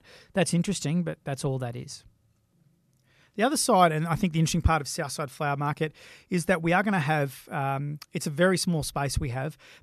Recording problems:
none

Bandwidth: 13.5 kHz